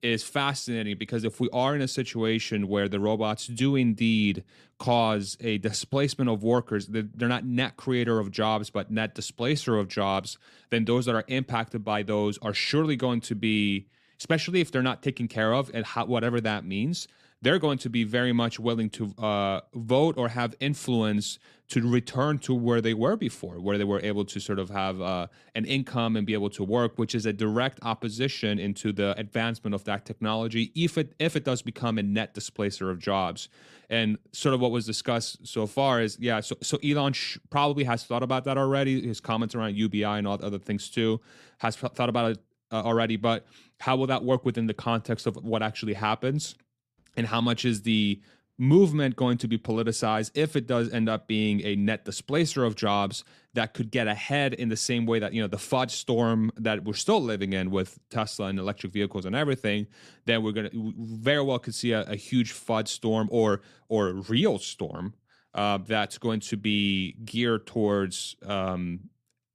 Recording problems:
none

